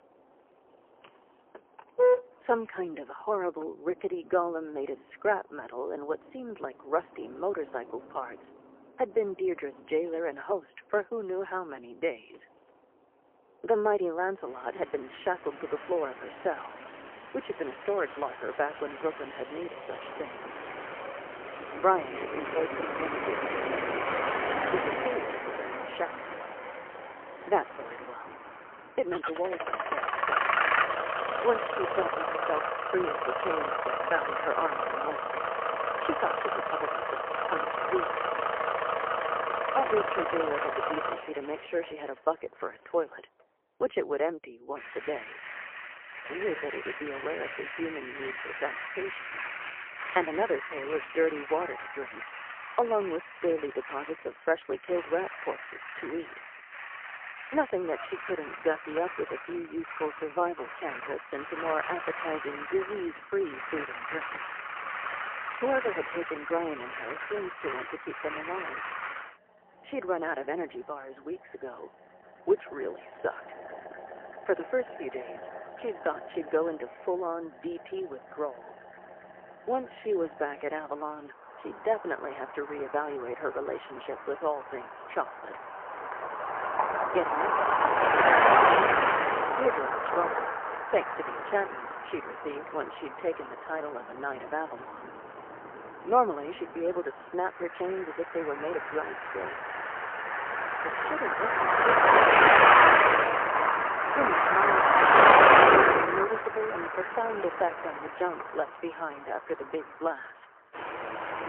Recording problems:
phone-call audio; poor line; nothing above 3 kHz
traffic noise; very loud; throughout; 6 dB above the speech

